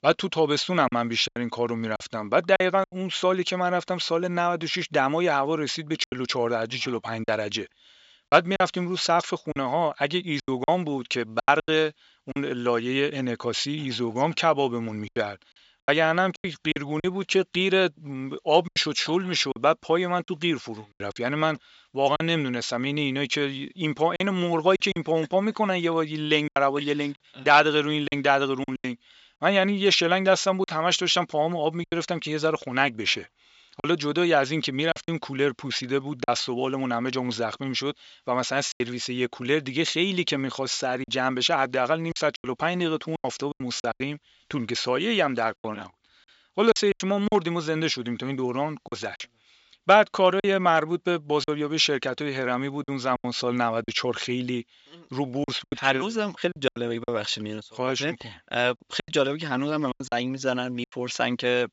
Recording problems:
high frequencies cut off; noticeable; nothing above 8 kHz
thin; very slightly; fading below 1 kHz
choppy; very; 7% of the speech affected

